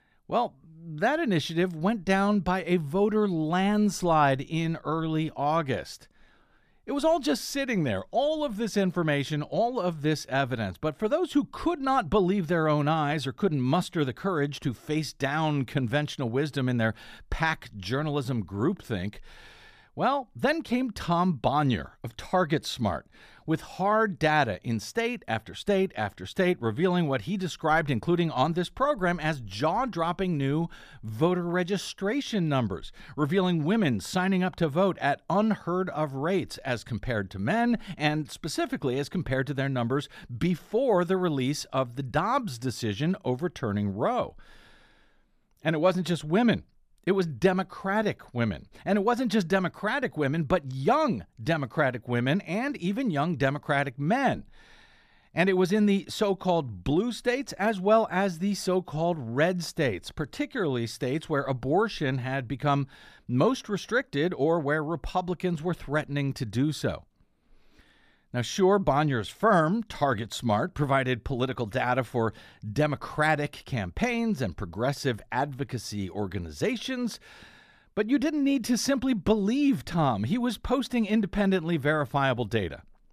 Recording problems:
none

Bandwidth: 14.5 kHz